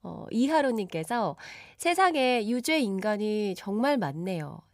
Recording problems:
none

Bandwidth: 15.5 kHz